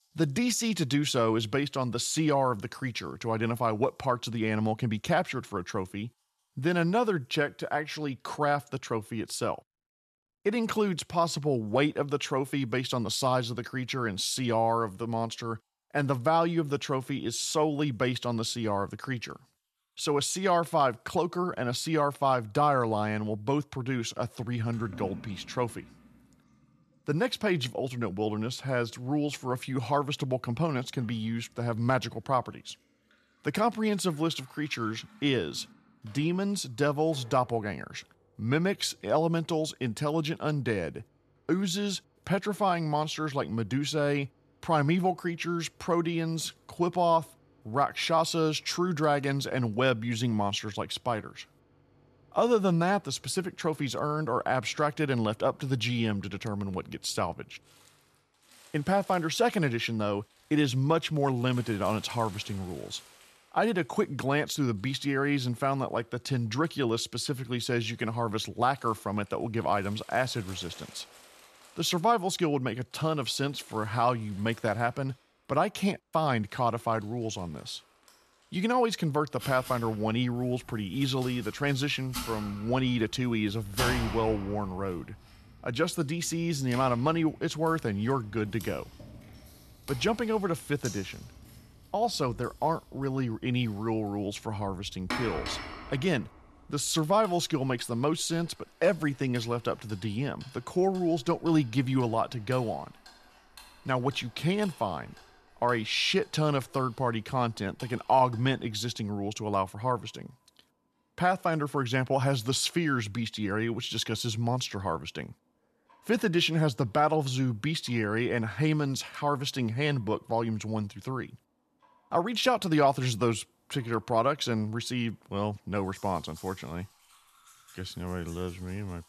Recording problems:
household noises; noticeable; throughout; 15 dB below the speech

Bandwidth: 13.5 kHz